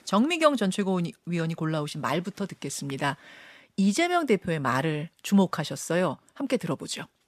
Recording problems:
none

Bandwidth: 14.5 kHz